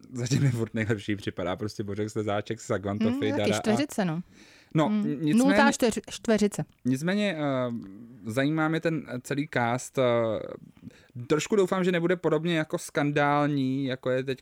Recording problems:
none

